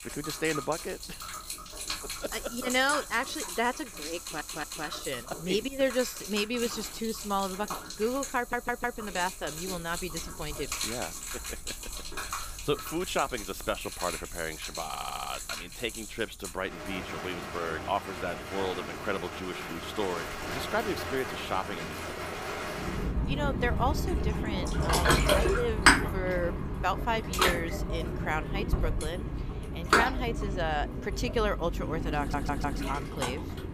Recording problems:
rain or running water; very loud; throughout; as loud as the speech
audio stuttering; 4 times, first at 4 s

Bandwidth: 15 kHz